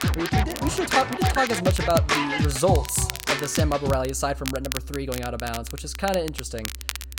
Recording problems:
background music; very loud; throughout; 1 dB above the speech
crackle, like an old record; loud; 9 dB below the speech

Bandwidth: 16.5 kHz